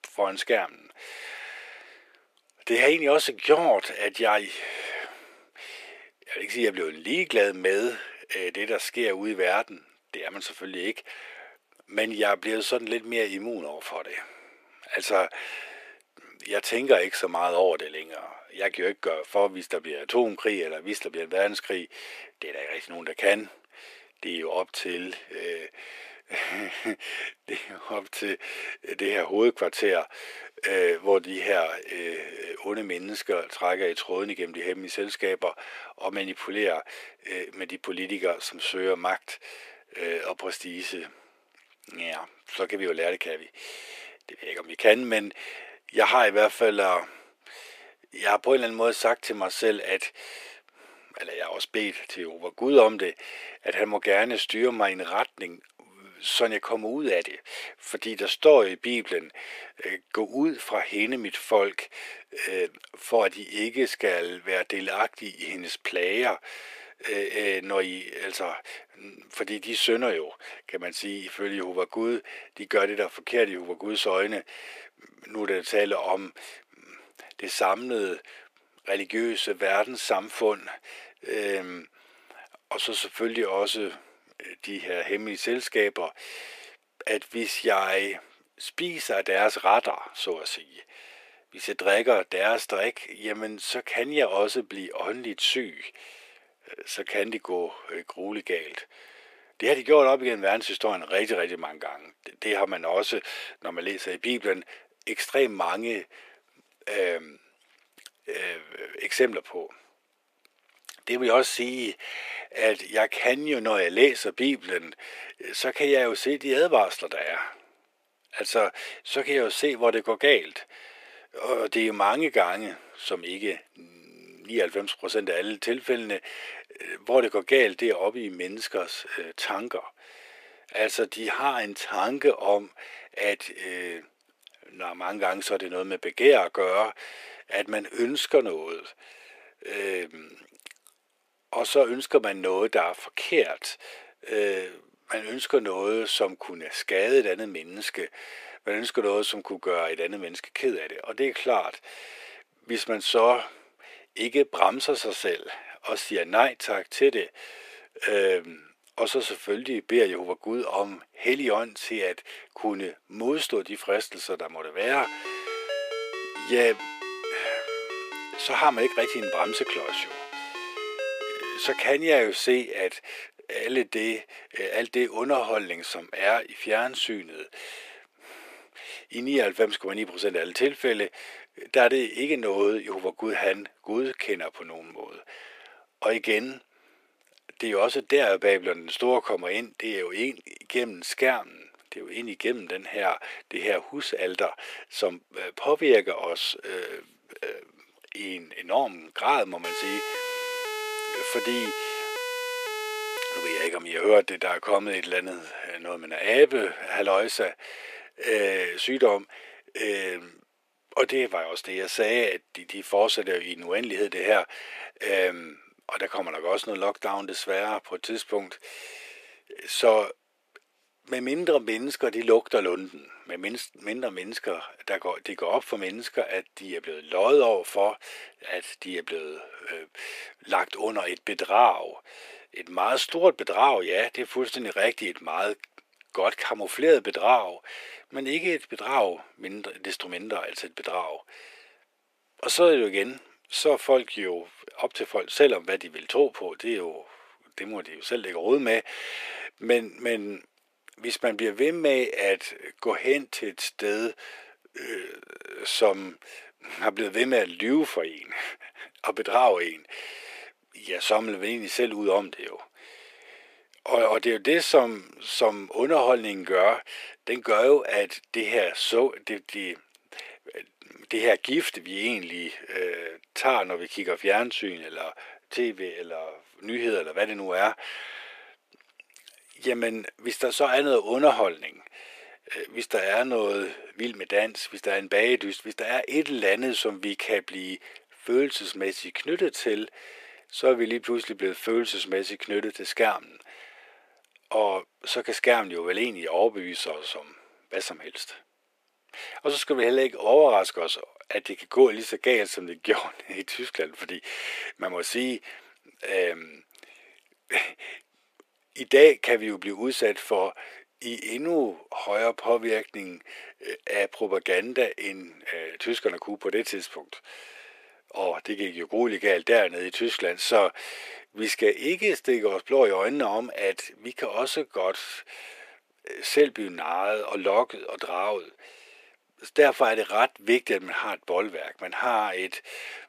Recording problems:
thin; very; fading below 400 Hz
phone ringing; noticeable; from 2:45 to 2:52; peak 5 dB below the speech
siren; noticeable; from 3:20 to 3:24; peak 4 dB below the speech

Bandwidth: 14.5 kHz